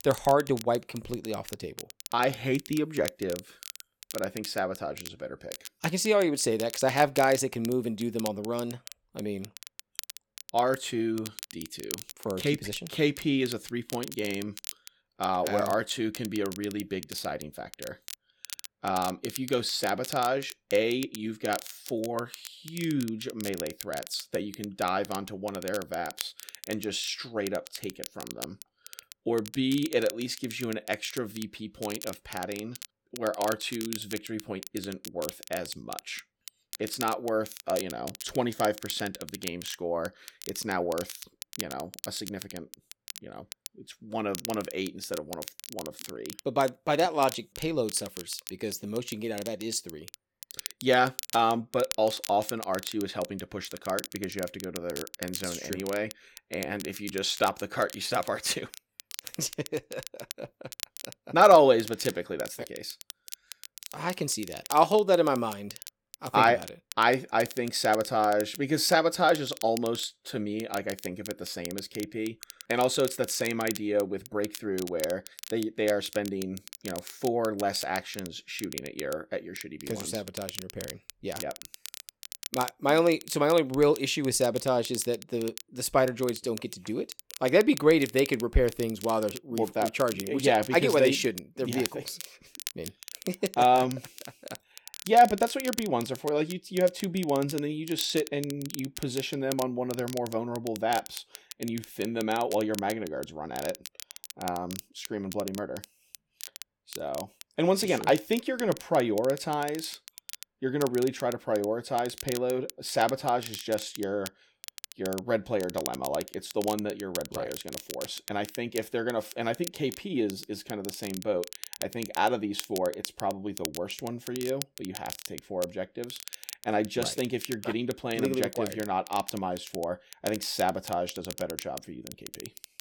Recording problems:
crackle, like an old record; noticeable; 15 dB below the speech

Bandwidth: 17.5 kHz